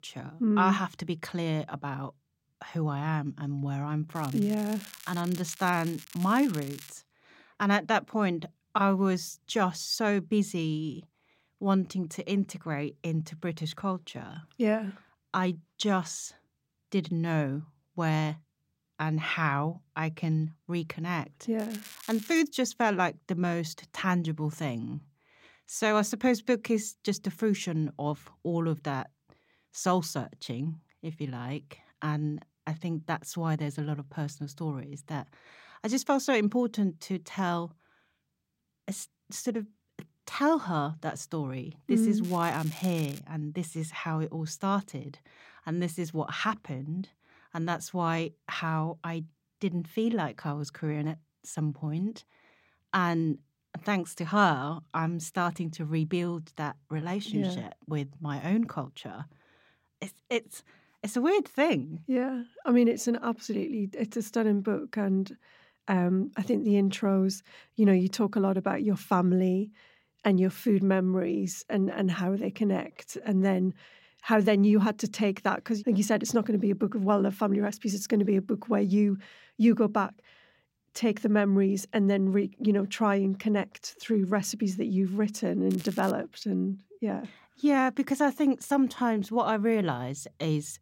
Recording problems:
crackling; noticeable; 4 times, first at 4 s; 15 dB below the speech

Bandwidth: 16 kHz